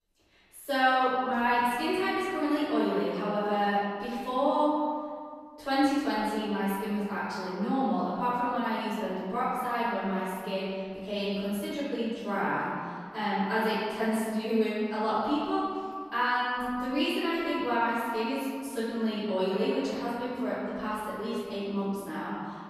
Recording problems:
room echo; strong; dies away in 2 s
off-mic speech; far

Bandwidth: 13.5 kHz